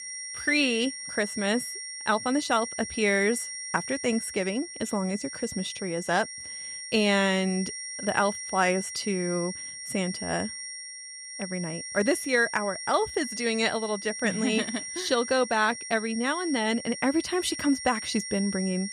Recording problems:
high-pitched whine; loud; throughout; 5.5 kHz, 8 dB below the speech

